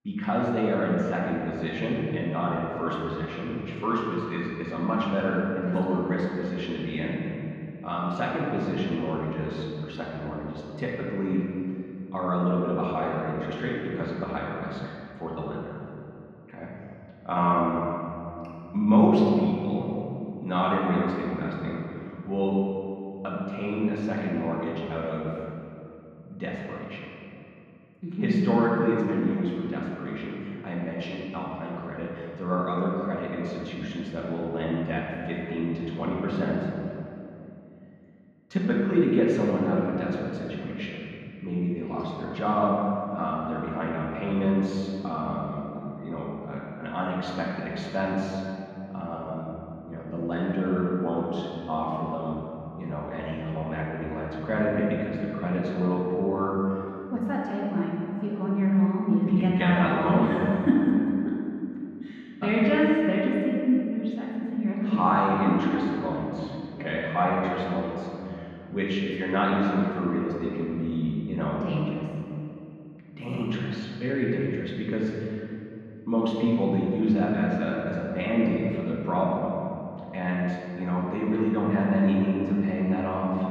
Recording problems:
off-mic speech; far
muffled; very; fading above 2.5 kHz
room echo; noticeable; dies away in 2.4 s

